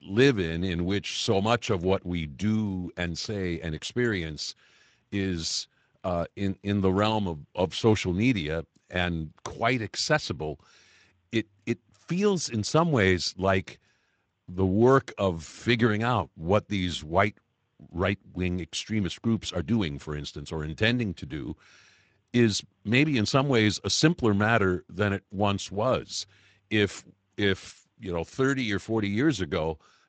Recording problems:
garbled, watery; slightly; nothing above 7.5 kHz

